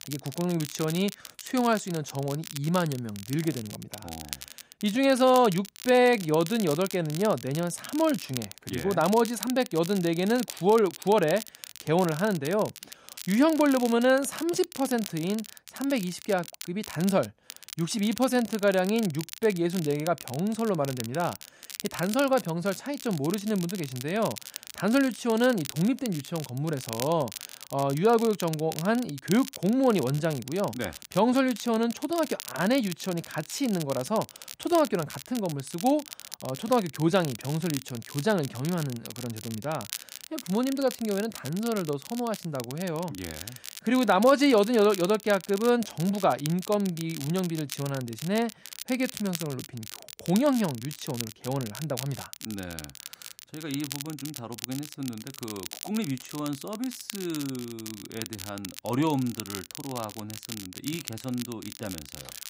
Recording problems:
crackle, like an old record; noticeable; 15 dB below the speech

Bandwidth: 15.5 kHz